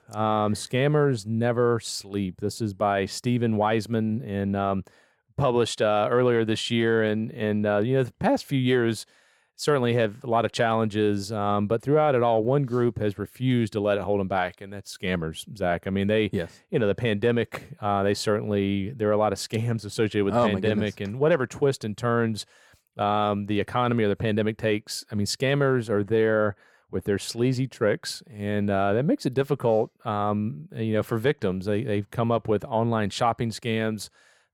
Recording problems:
none

